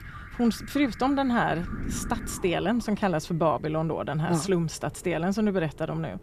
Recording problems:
alarms or sirens; noticeable; throughout; 20 dB below the speech
wind noise on the microphone; occasional gusts; 20 dB below the speech

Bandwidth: 14.5 kHz